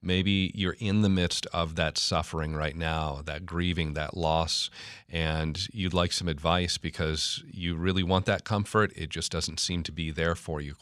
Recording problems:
none

